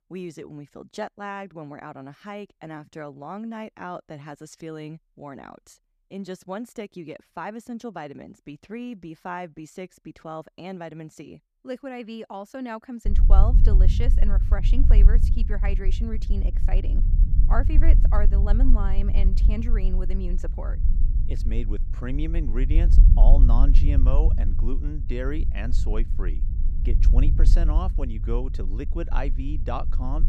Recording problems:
low rumble; loud; from 13 s on; 8 dB below the speech

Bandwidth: 14.5 kHz